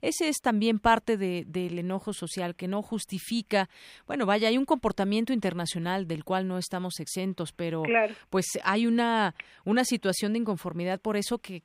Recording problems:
none

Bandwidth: 15.5 kHz